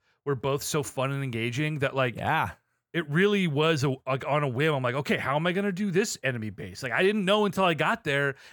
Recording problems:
none

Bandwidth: 18.5 kHz